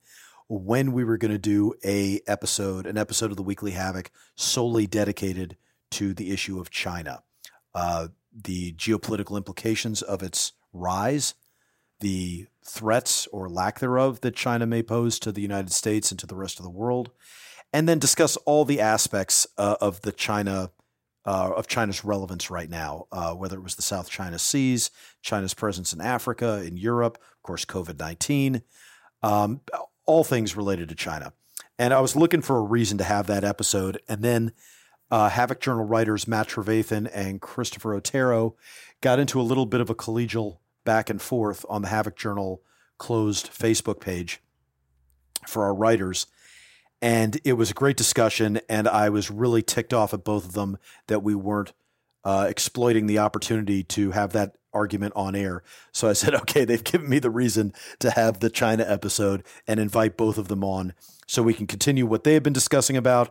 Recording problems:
none

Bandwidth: 16 kHz